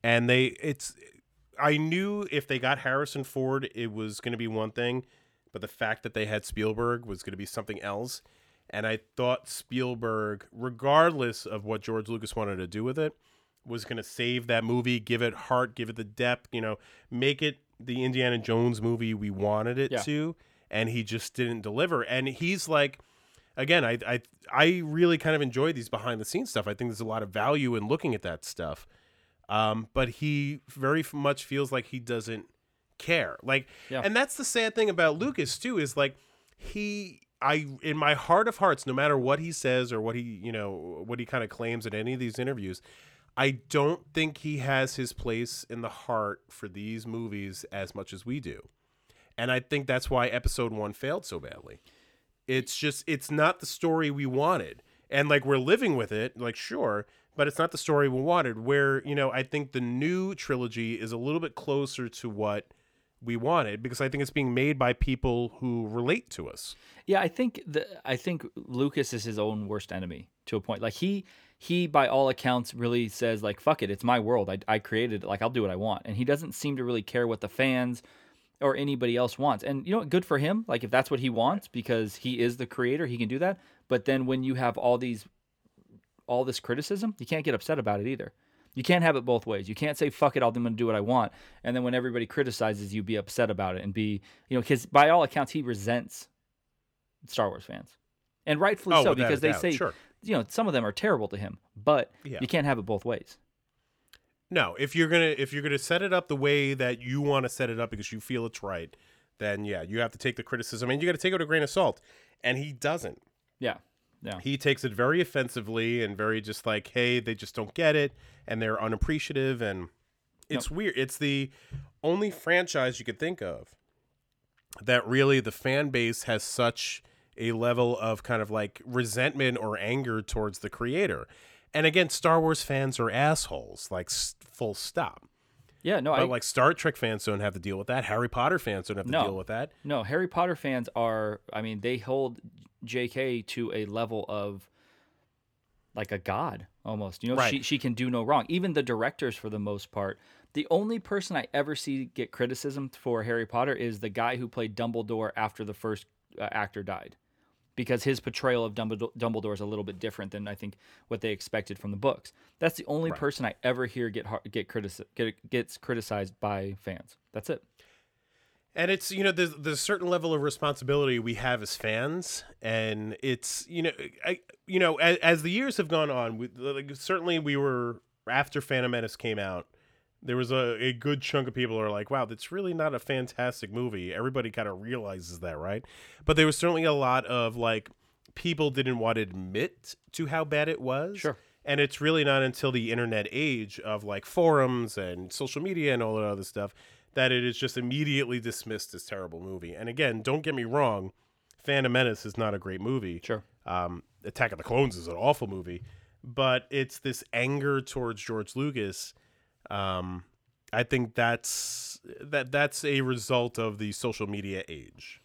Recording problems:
none

